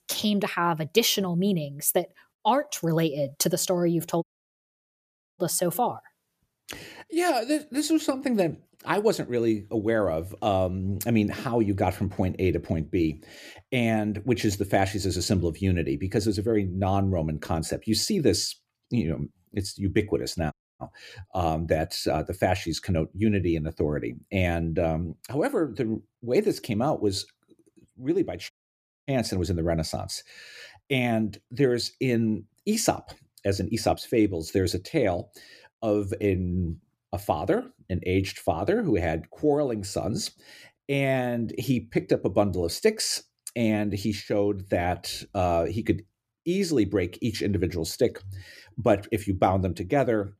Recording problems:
audio cutting out; at 4 s for 1 s, at 21 s and at 29 s for 0.5 s

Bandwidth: 14.5 kHz